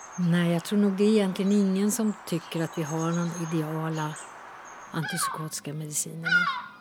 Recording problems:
animal sounds; loud; throughout; 6 dB below the speech

